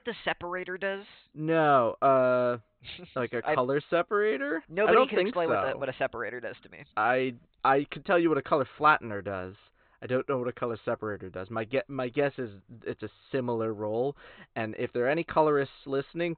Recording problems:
high frequencies cut off; severe; nothing above 4 kHz

